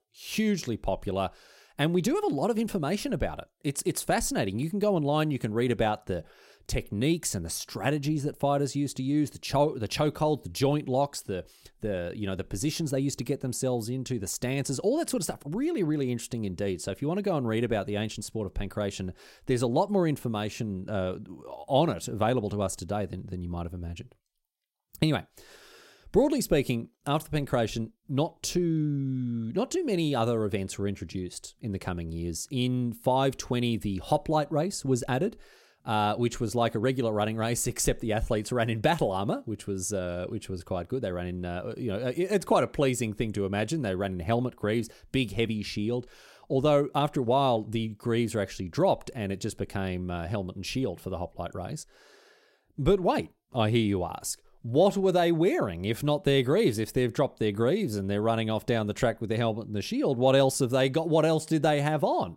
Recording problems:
none

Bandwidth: 16 kHz